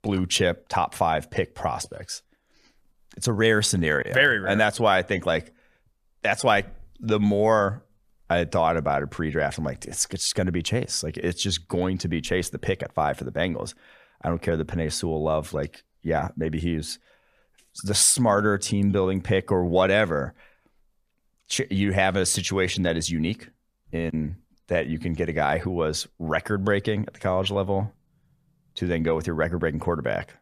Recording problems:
none

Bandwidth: 14.5 kHz